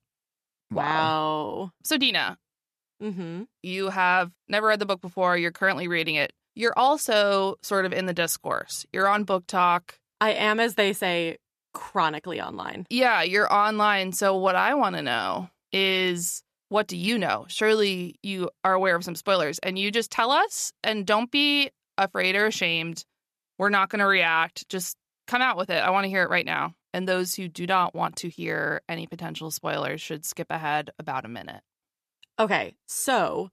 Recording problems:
none

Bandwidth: 14 kHz